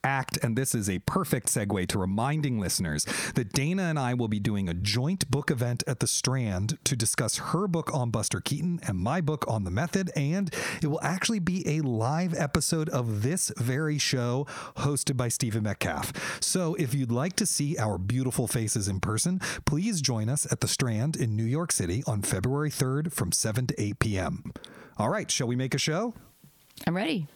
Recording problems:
squashed, flat; heavily

